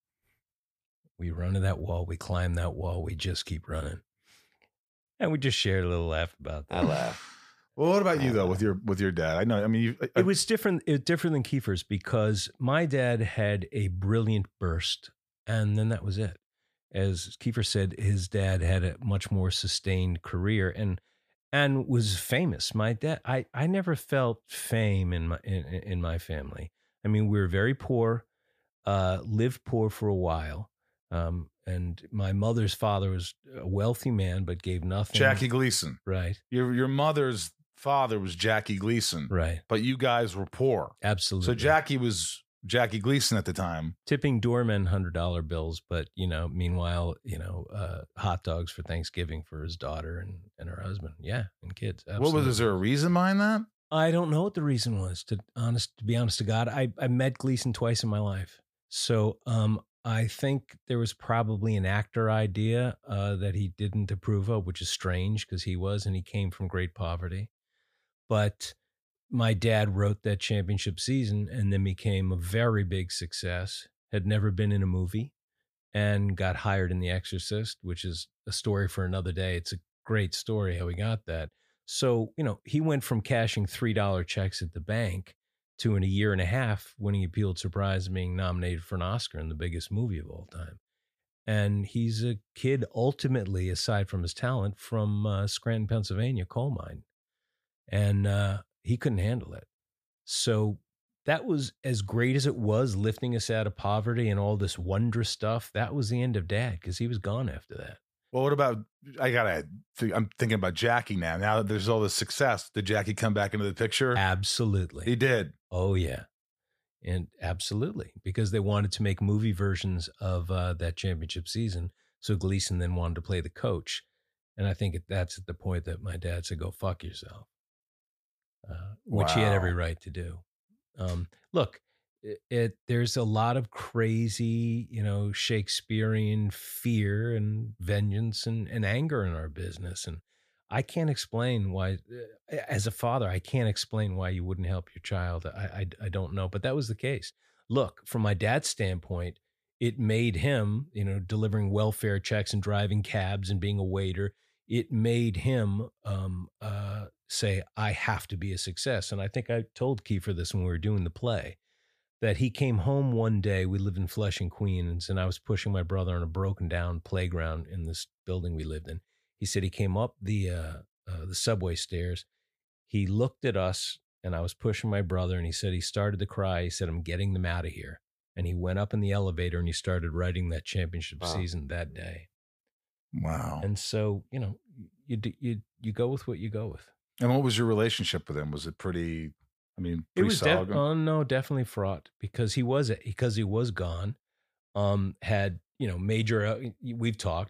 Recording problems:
none

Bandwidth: 15 kHz